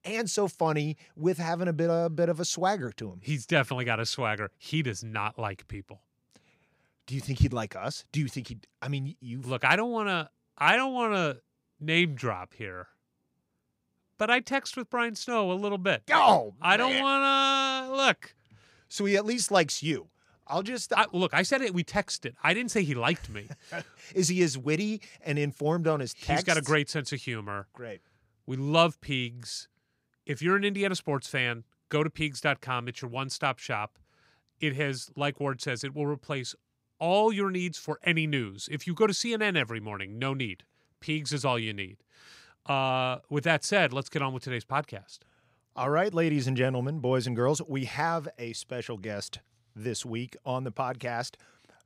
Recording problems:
none

